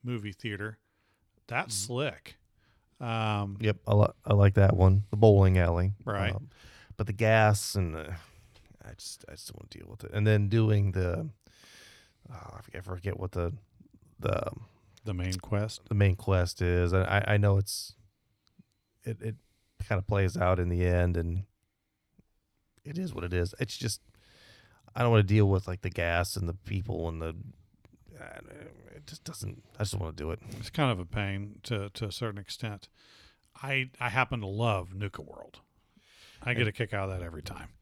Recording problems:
none

